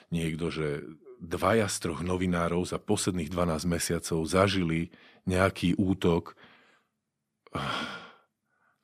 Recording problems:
none

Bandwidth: 14.5 kHz